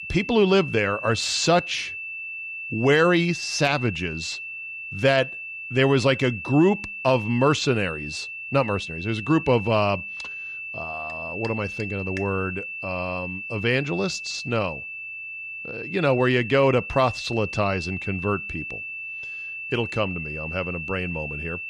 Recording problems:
high-pitched whine; loud; throughout; 2.5 kHz, 8 dB below the speech

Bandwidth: 15 kHz